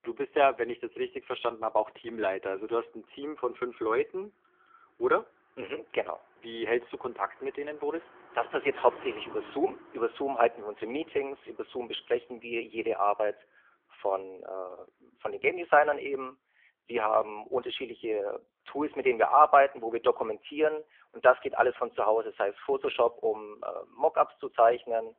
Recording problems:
phone-call audio; poor line; nothing above 3.5 kHz
traffic noise; faint; throughout; 25 dB below the speech

